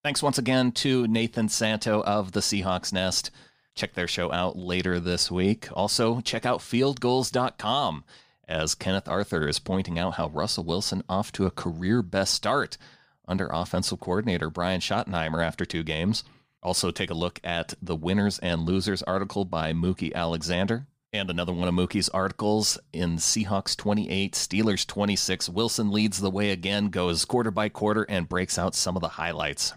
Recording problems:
none

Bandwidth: 15 kHz